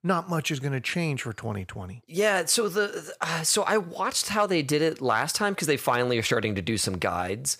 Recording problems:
none

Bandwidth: 15 kHz